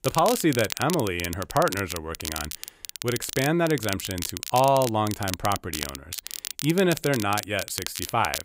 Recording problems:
crackle, like an old record; loud; 8 dB below the speech

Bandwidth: 15.5 kHz